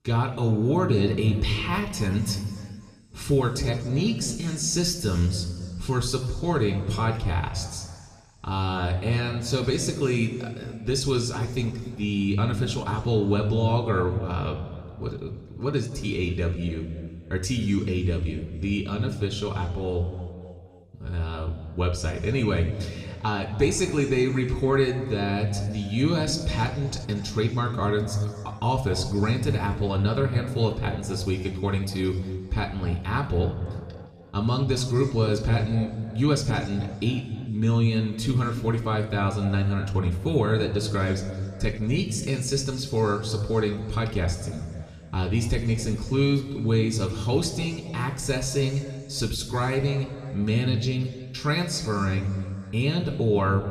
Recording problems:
room echo; slight; dies away in 2 s
off-mic speech; somewhat distant

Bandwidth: 14 kHz